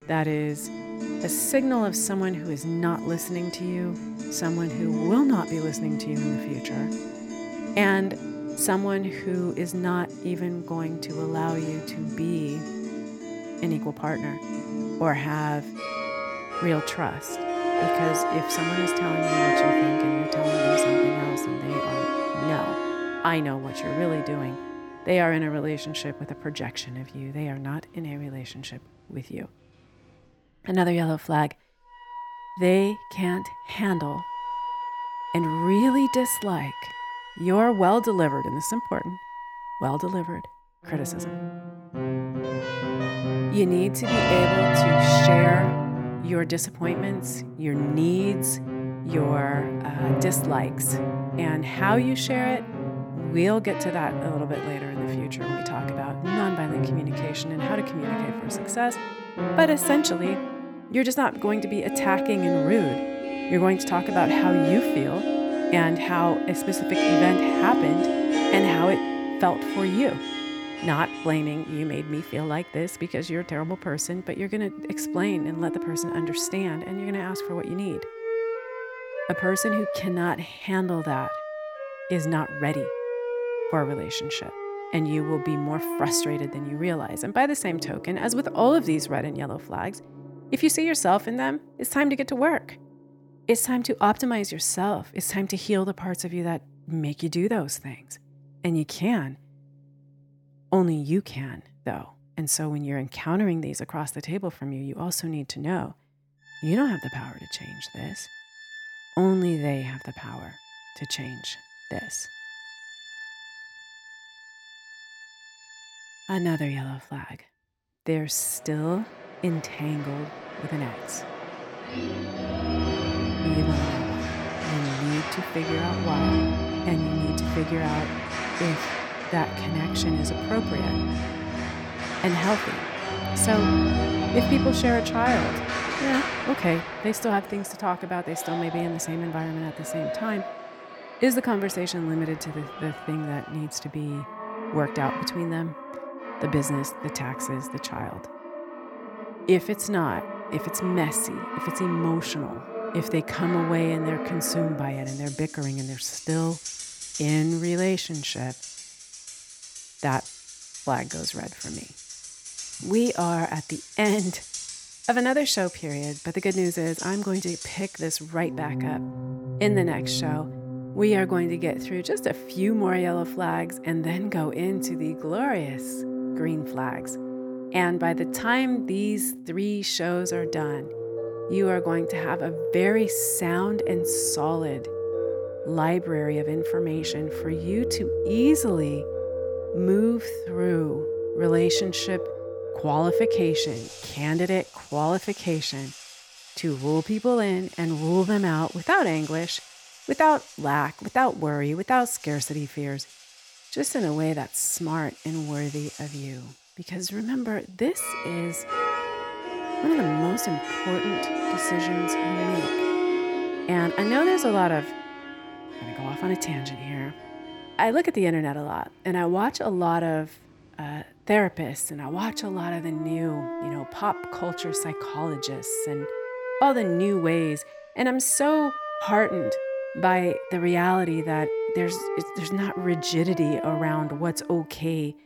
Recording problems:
background music; loud; throughout; 3 dB below the speech

